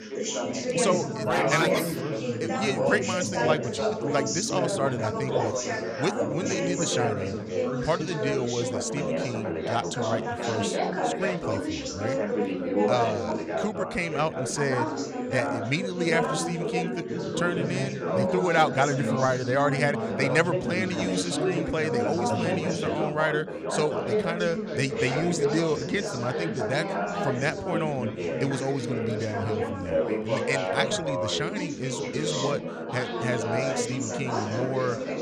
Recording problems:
chatter from many people; very loud; throughout; as loud as the speech

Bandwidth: 15.5 kHz